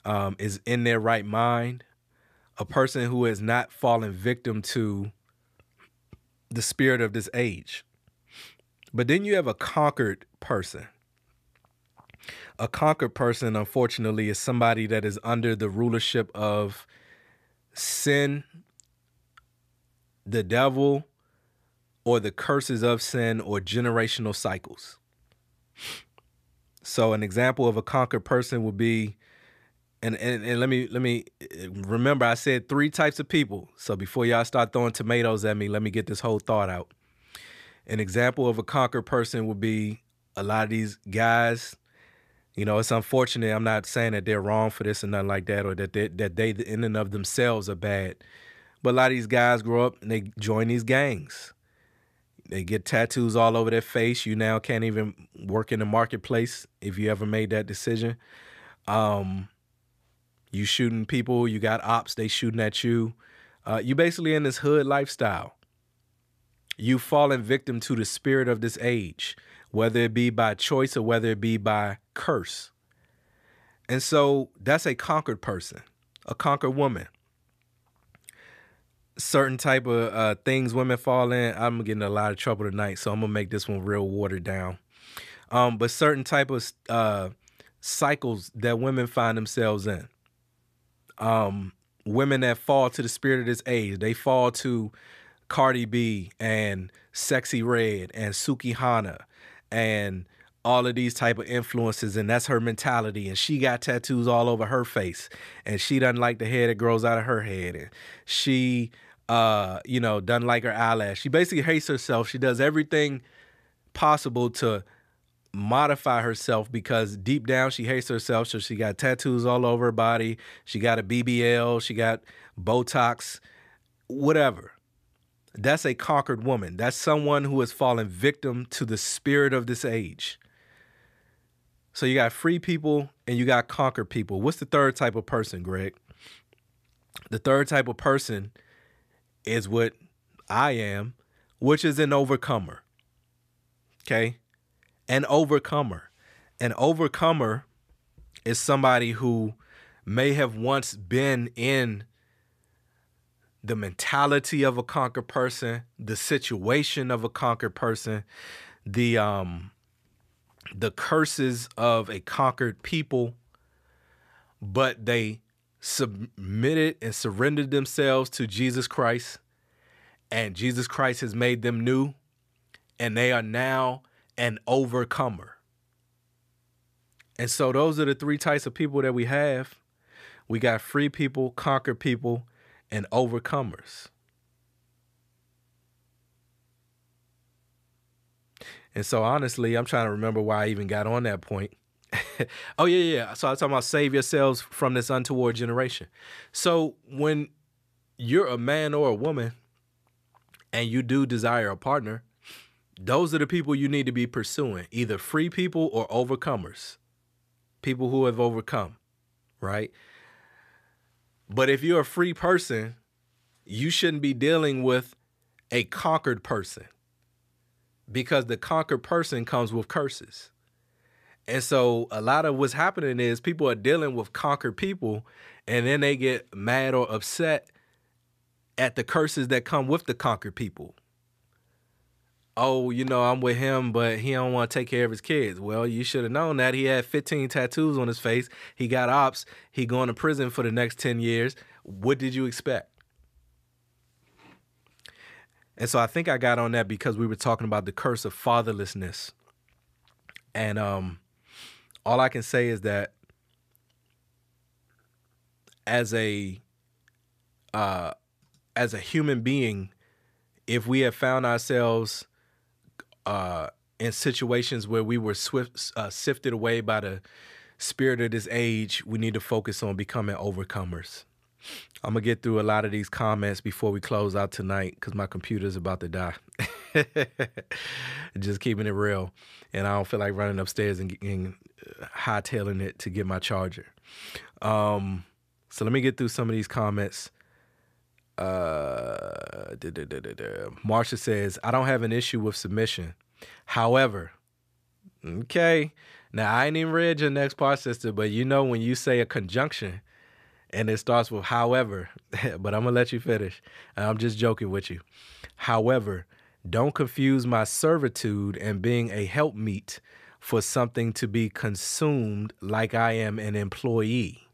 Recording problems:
none

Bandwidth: 14.5 kHz